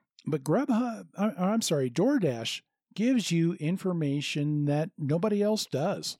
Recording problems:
none

